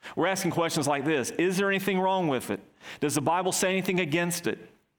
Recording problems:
squashed, flat; heavily

